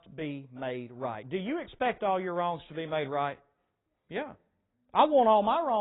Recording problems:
garbled, watery; badly; nothing above 3.5 kHz
abrupt cut into speech; at the end

